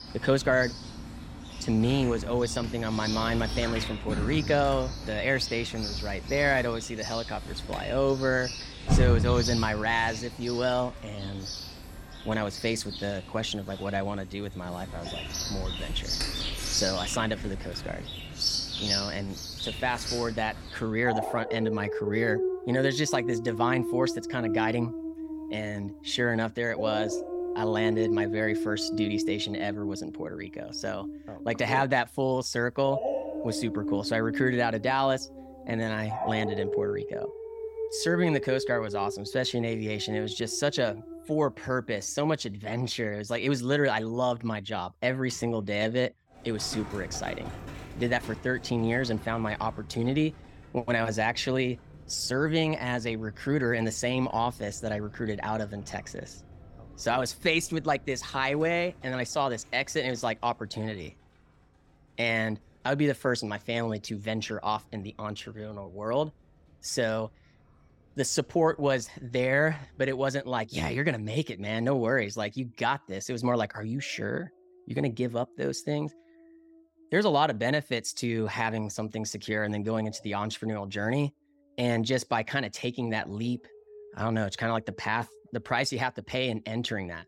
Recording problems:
animal sounds; loud; throughout; 5 dB below the speech

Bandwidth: 16.5 kHz